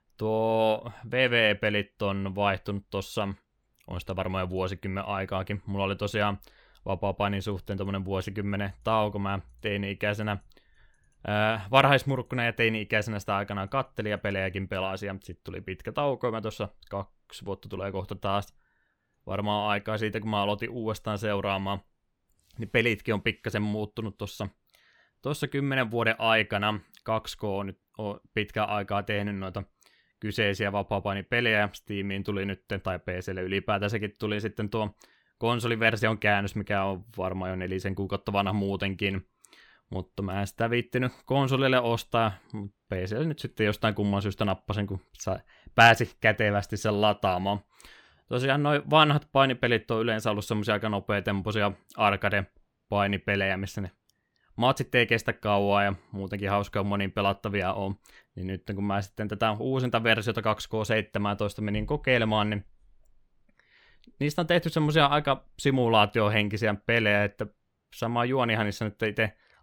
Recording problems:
none

